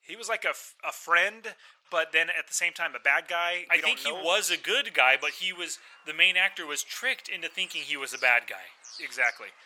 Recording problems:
thin; very; fading below 900 Hz
animal sounds; faint; throughout; 25 dB below the speech

